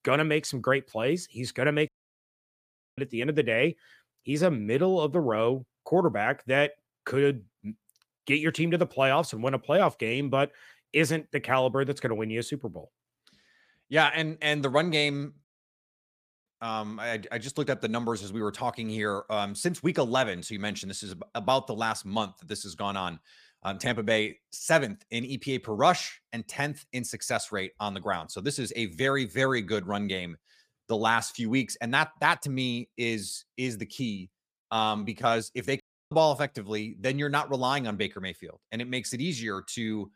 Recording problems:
audio cutting out; at 2 s for 1 s, at 15 s for 1 s and at 36 s

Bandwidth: 15 kHz